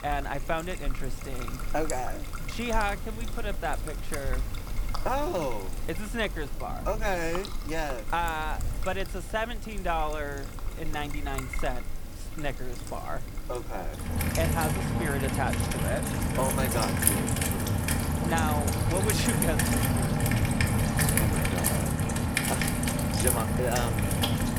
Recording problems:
rain or running water; very loud; throughout; 4 dB above the speech

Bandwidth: 18 kHz